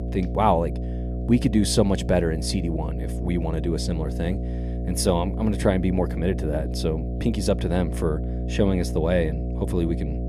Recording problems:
electrical hum; noticeable; throughout; 60 Hz, 10 dB below the speech

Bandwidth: 14.5 kHz